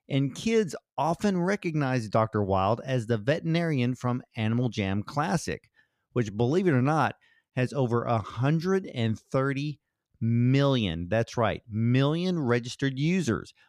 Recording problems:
none

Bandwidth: 15.5 kHz